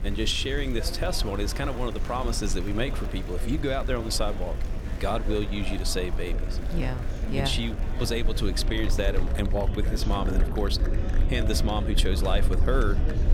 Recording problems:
murmuring crowd; noticeable; throughout; 10 dB below the speech
low rumble; noticeable; throughout; 15 dB below the speech

